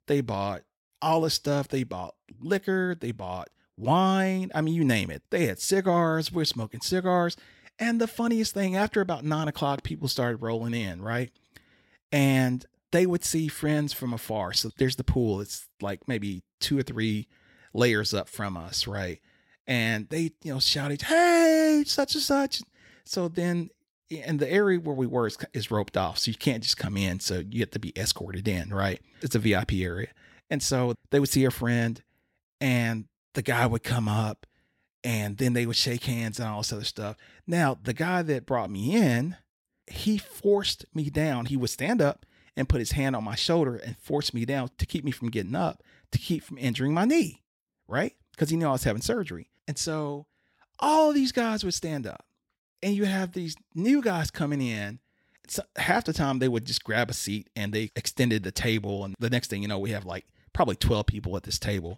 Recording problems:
none

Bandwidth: 16 kHz